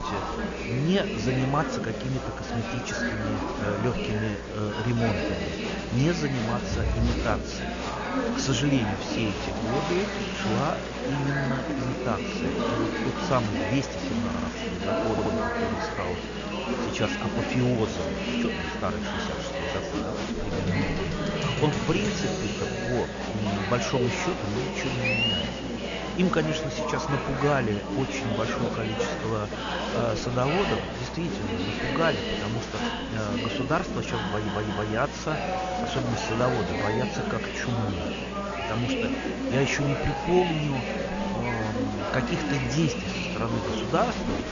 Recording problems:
high frequencies cut off; noticeable; nothing above 7 kHz
murmuring crowd; very loud; throughout; as loud as the speech
electrical hum; noticeable; throughout; 60 Hz, 20 dB below the speech
hiss; noticeable; throughout; 20 dB below the speech
audio stuttering; at 14 s, at 15 s and at 34 s

